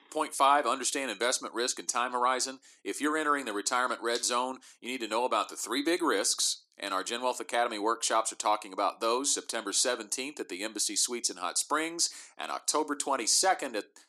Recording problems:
thin; very; fading below 300 Hz

